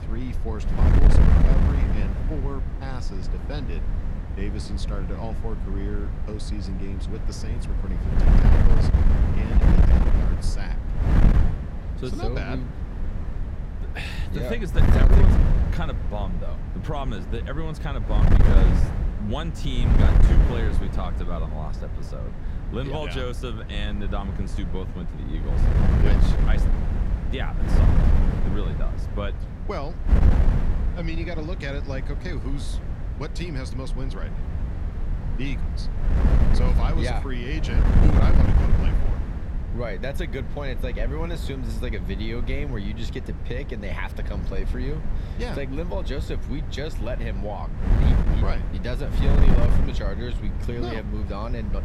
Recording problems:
wind noise on the microphone; heavy; 1 dB below the speech

